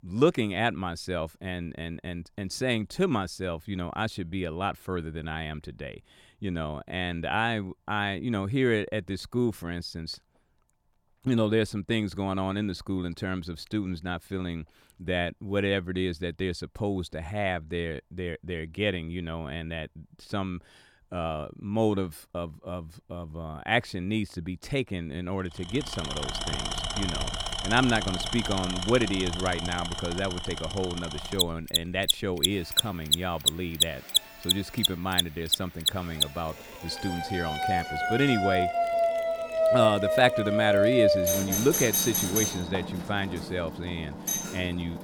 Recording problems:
machinery noise; very loud; from 26 s on; as loud as the speech
alarms or sirens; very loud; from 29 s on; 3 dB above the speech

